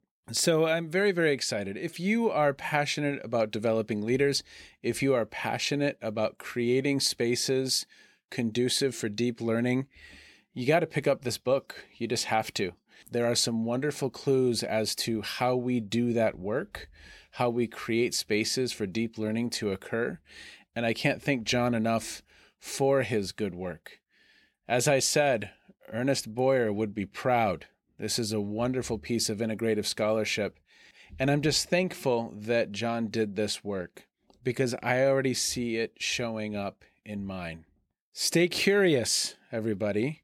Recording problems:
none

